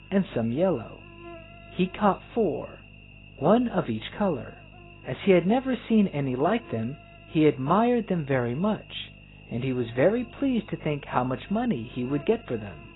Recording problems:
garbled, watery; badly; nothing above 4 kHz
electrical hum; faint; throughout; 50 Hz, 20 dB below the speech

